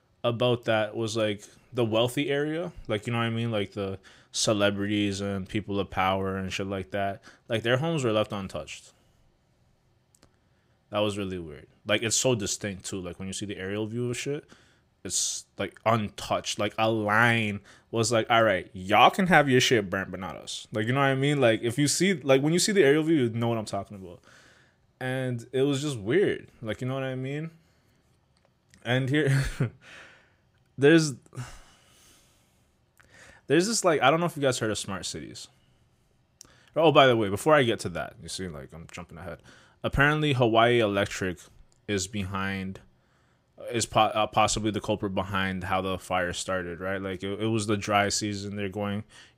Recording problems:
none

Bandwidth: 15.5 kHz